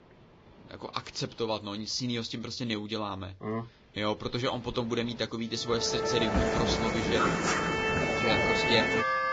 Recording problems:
garbled, watery; badly
background music; very loud; from 6 s on; 4 dB above the speech
rain or running water; noticeable; throughout; 15 dB below the speech

